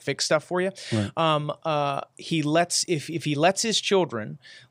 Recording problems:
none

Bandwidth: 15.5 kHz